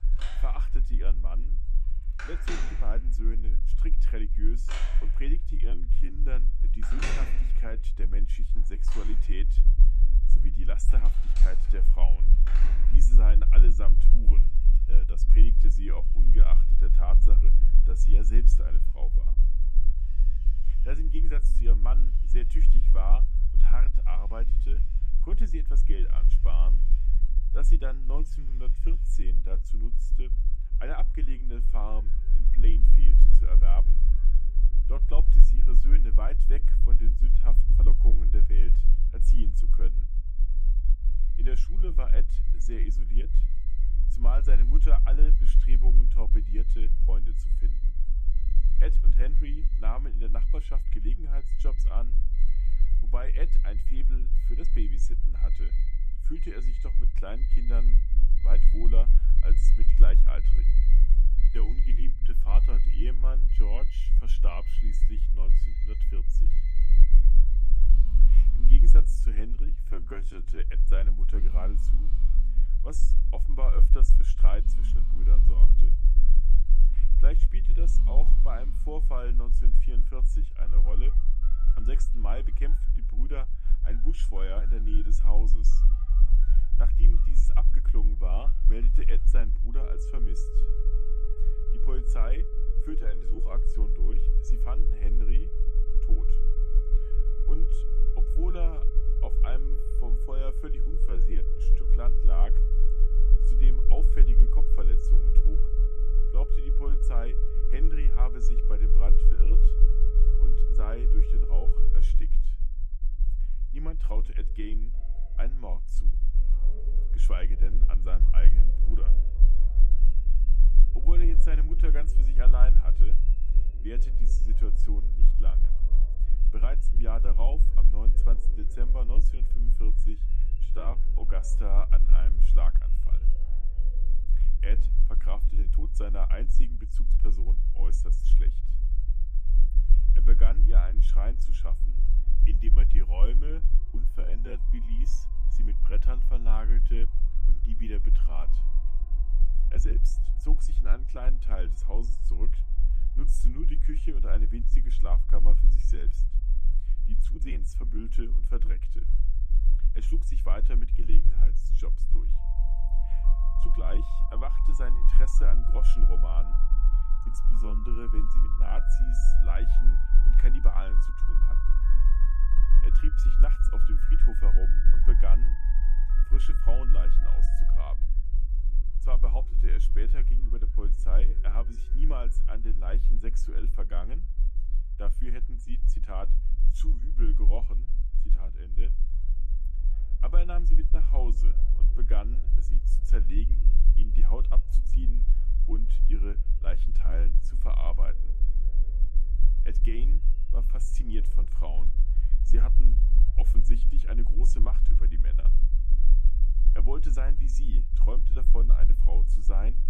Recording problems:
alarms or sirens; loud; throughout; 6 dB below the speech
low rumble; loud; throughout; 10 dB below the speech
uneven, jittery; strongly; from 5.5 s to 3:15

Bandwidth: 14.5 kHz